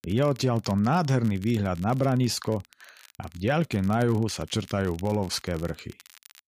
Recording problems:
crackle, like an old record; faint; 25 dB below the speech

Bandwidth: 15 kHz